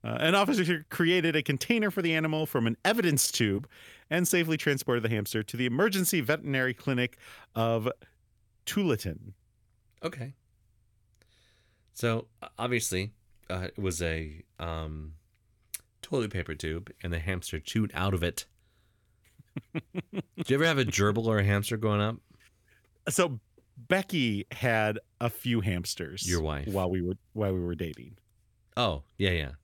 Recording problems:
none

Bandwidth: 17.5 kHz